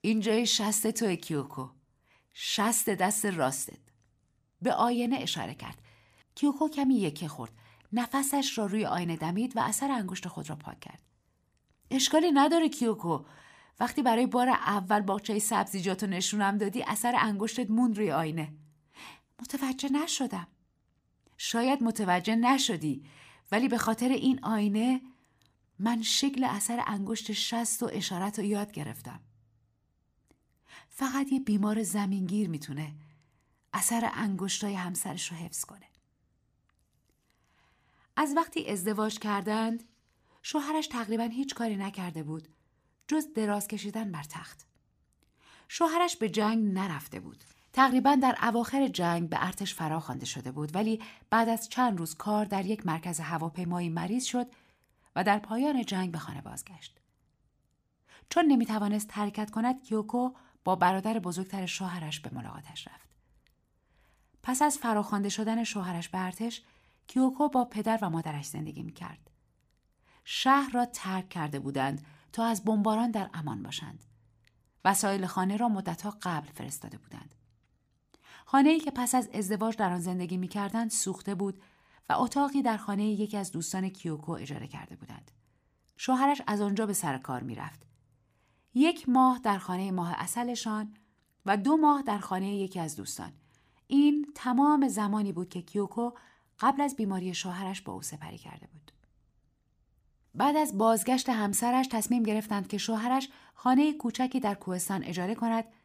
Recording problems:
none

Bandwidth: 15 kHz